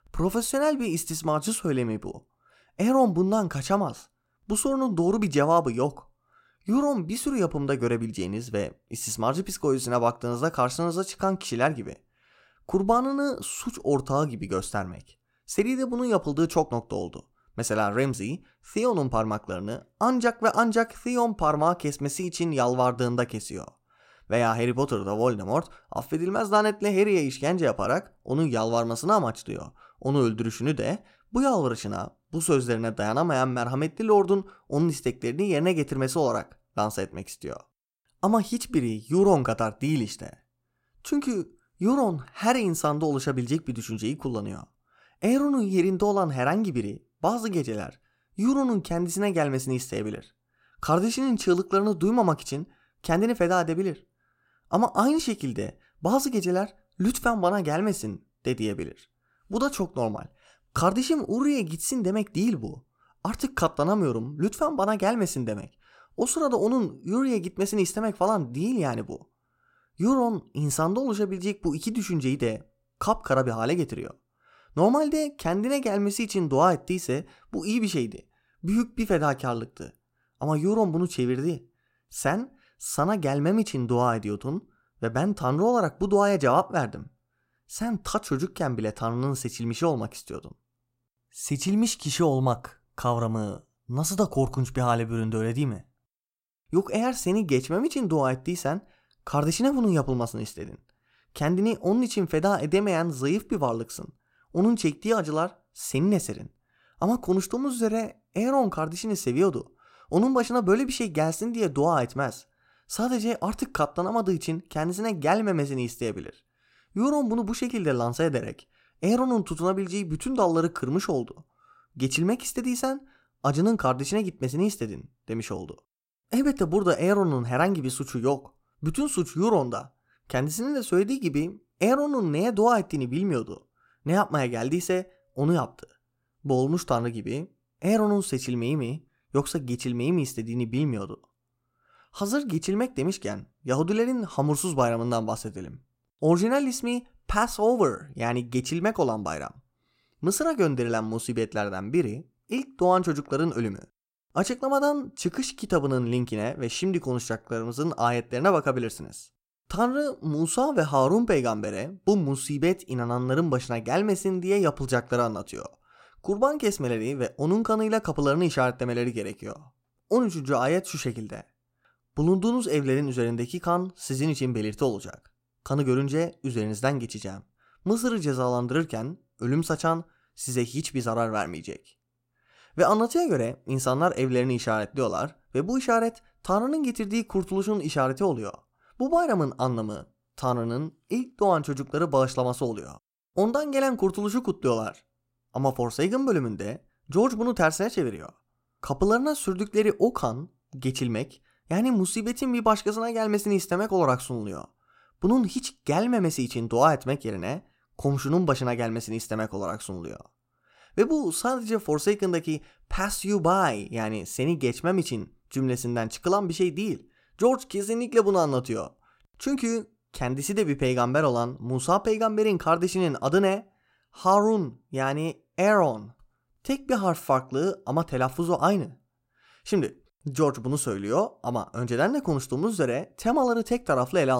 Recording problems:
abrupt cut into speech; at the end

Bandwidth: 16 kHz